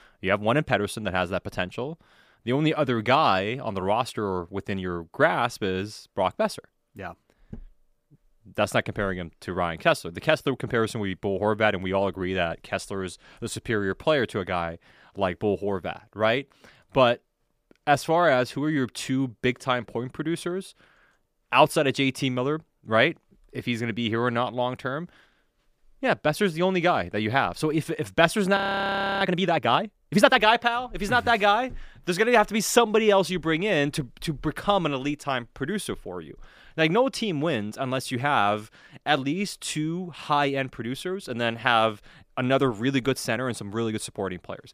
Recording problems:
audio freezing; at 29 s for 0.5 s

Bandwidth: 15 kHz